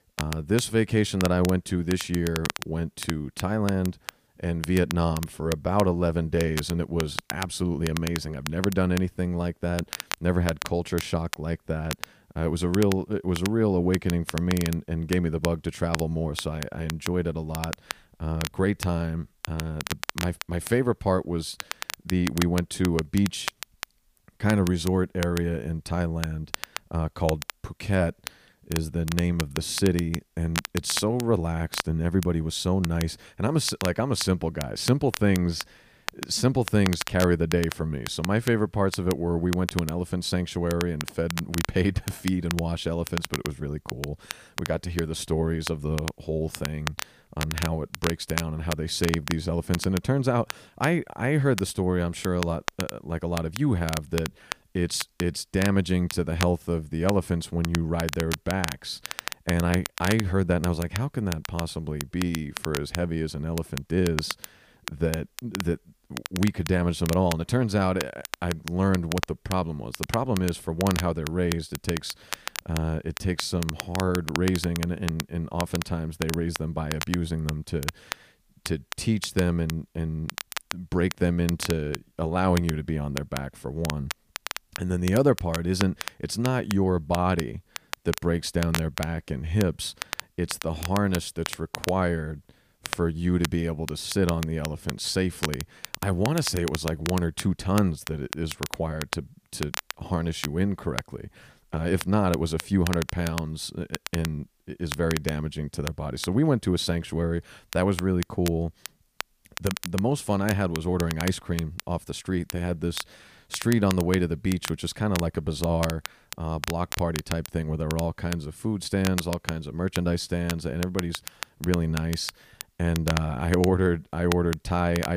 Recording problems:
crackle, like an old record; loud; 9 dB below the speech
abrupt cut into speech; at the end

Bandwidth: 15 kHz